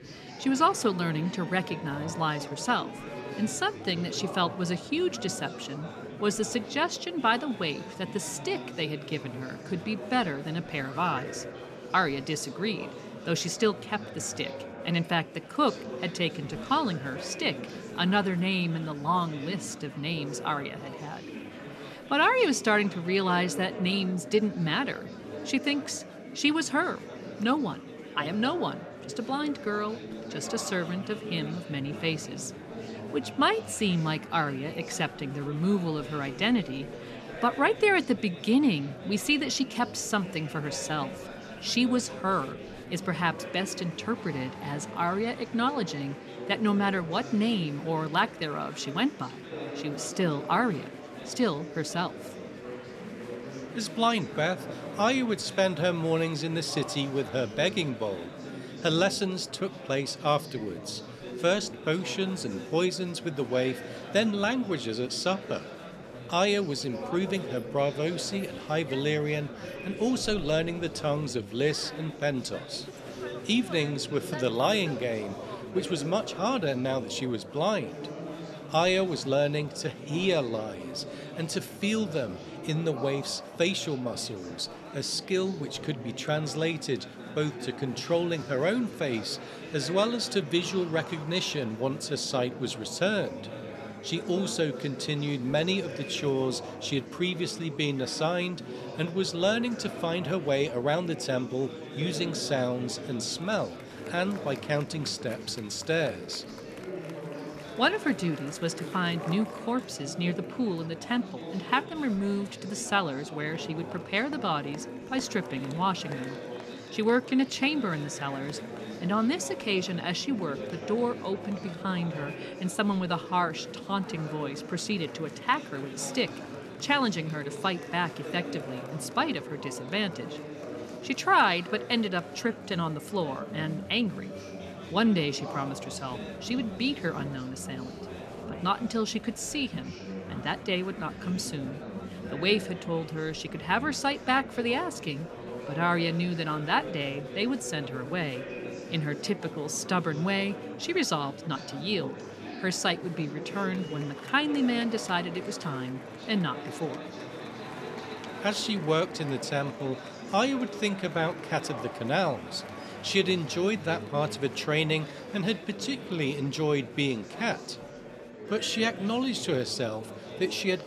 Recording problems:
murmuring crowd; noticeable; throughout; 10 dB below the speech

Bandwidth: 13.5 kHz